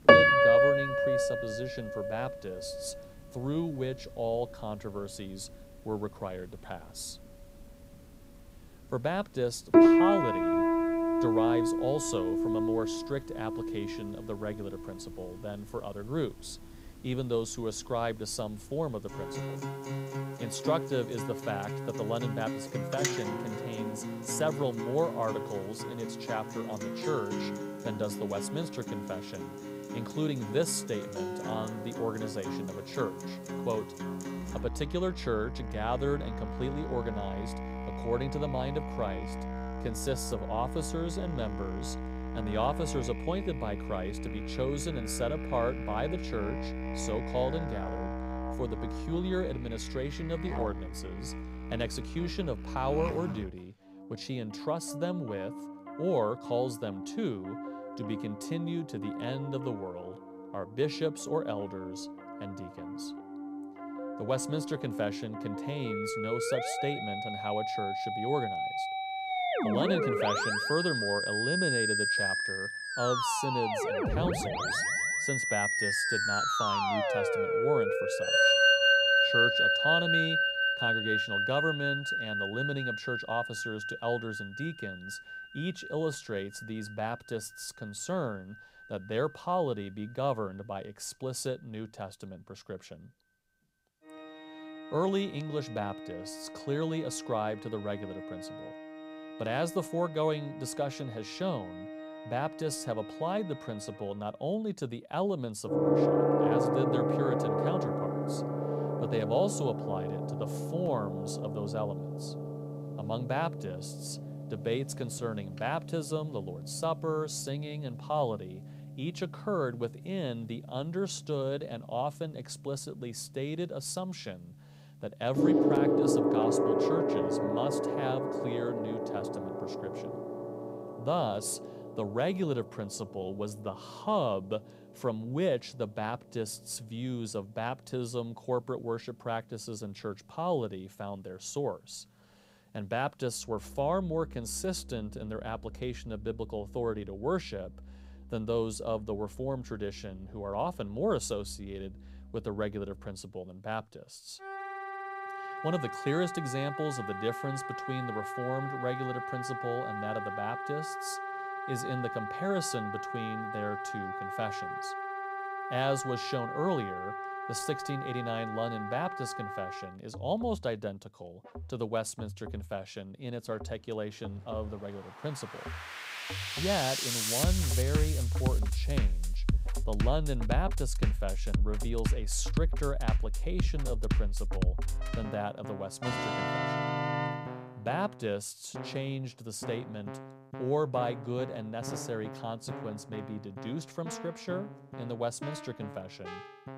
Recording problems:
background music; very loud; throughout; 3 dB above the speech

